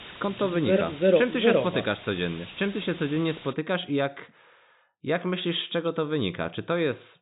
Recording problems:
high frequencies cut off; severe; nothing above 4 kHz
hiss; noticeable; until 3.5 s; 15 dB below the speech

